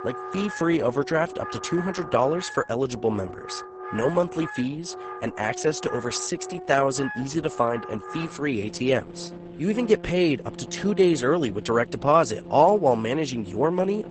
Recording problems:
garbled, watery; badly; nothing above 8 kHz
background music; noticeable; throughout; 15 dB below the speech

